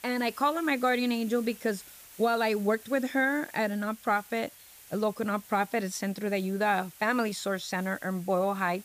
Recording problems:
hiss; noticeable; throughout; 20 dB below the speech

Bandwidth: 15 kHz